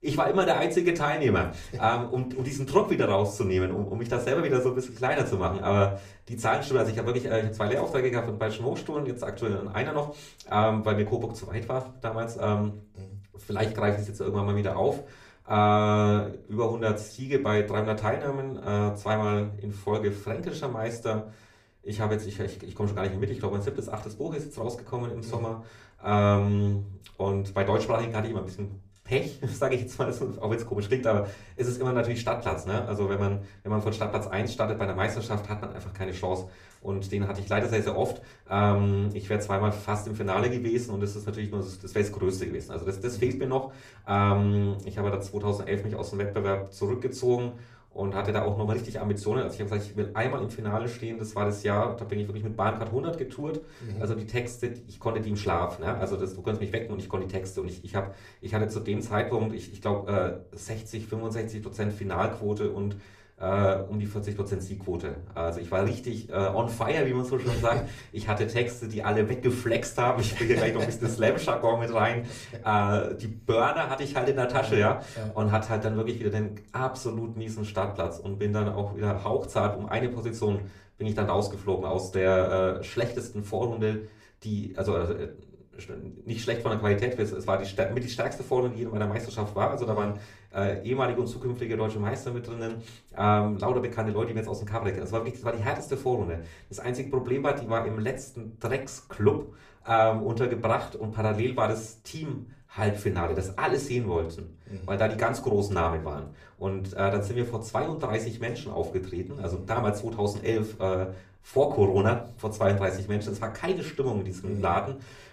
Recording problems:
off-mic speech; far
room echo; very slight; dies away in 0.4 s

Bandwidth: 14.5 kHz